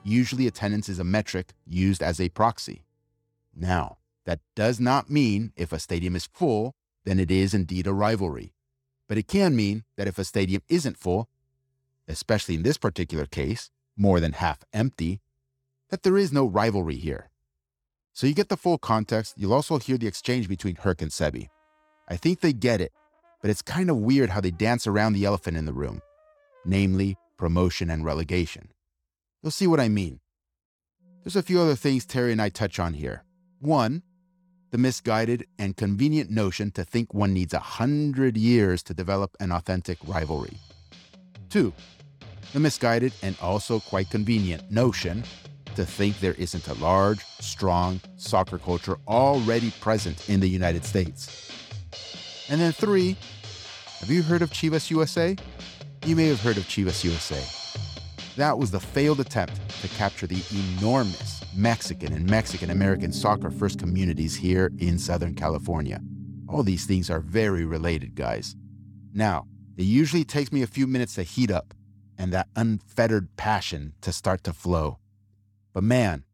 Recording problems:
background music; noticeable; throughout; 15 dB below the speech

